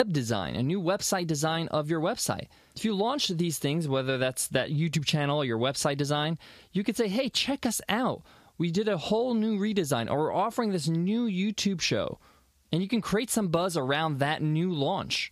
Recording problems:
squashed, flat; somewhat
abrupt cut into speech; at the start

